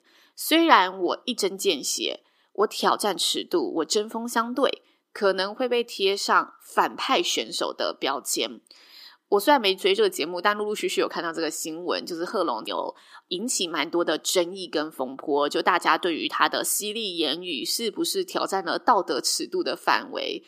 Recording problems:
thin; somewhat; fading below 300 Hz

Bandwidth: 15 kHz